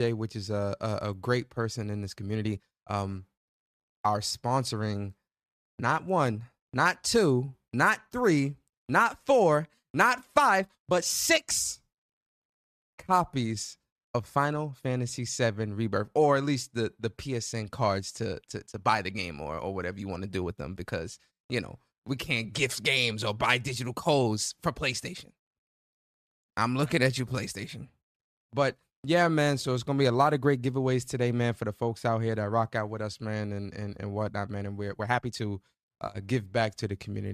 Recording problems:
abrupt cut into speech; at the start and the end
uneven, jittery; strongly; from 2 to 36 s

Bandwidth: 14.5 kHz